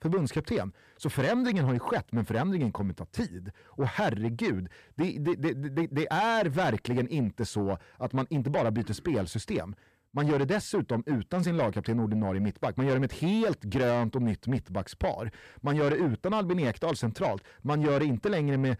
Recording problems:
distortion; slight; 10 dB below the speech

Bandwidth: 14.5 kHz